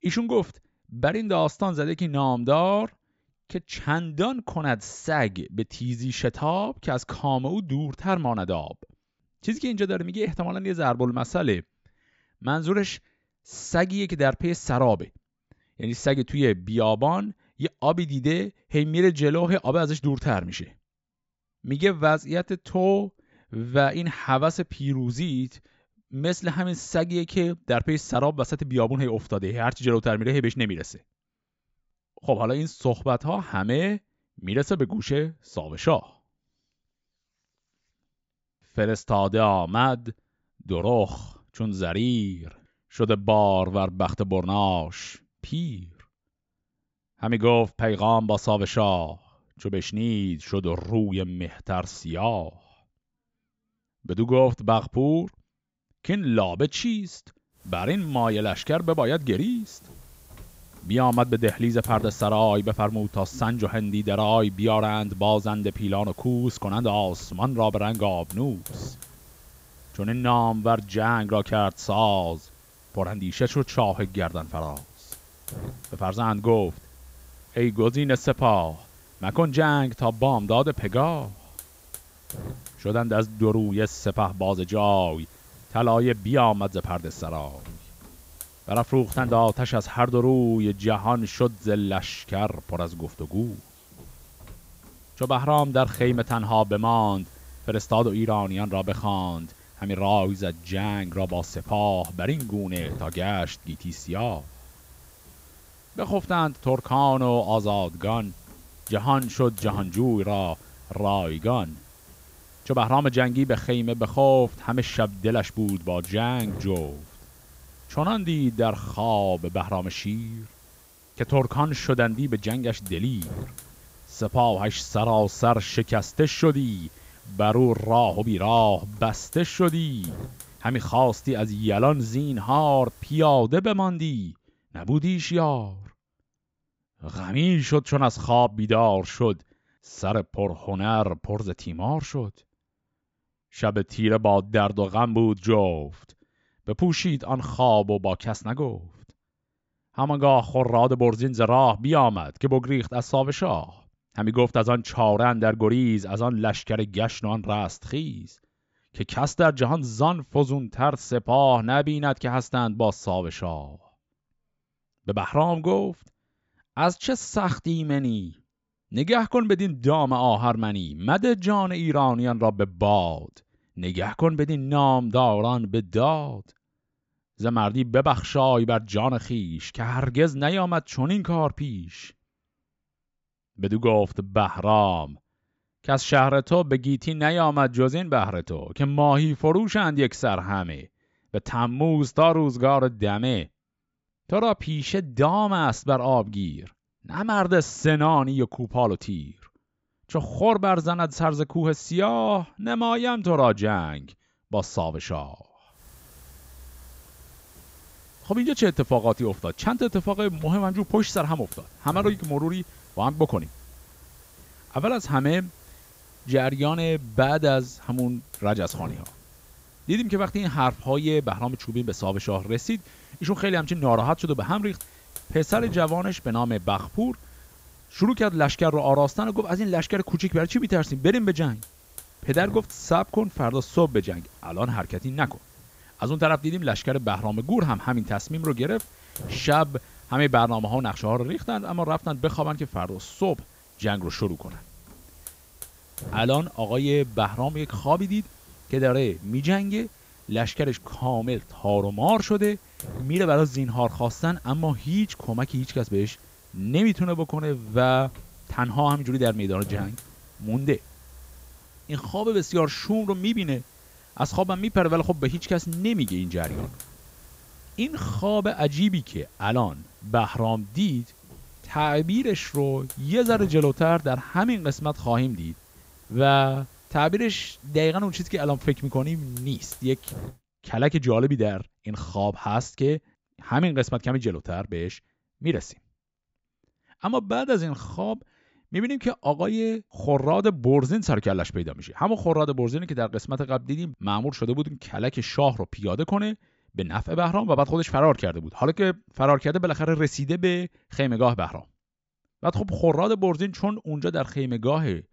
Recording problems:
high frequencies cut off; noticeable; nothing above 8 kHz
hiss; faint; from 58 s to 2:13 and from 3:26 to 4:40; 20 dB below the speech

